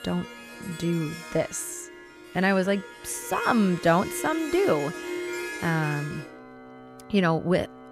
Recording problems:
background music; noticeable; throughout; 10 dB below the speech

